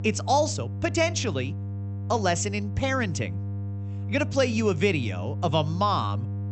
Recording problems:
high frequencies cut off; noticeable; nothing above 8 kHz
electrical hum; noticeable; throughout; 50 Hz, 20 dB below the speech

